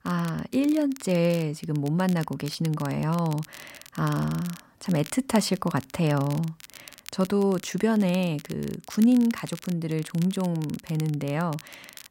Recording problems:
crackle, like an old record; noticeable; 20 dB below the speech

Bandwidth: 16 kHz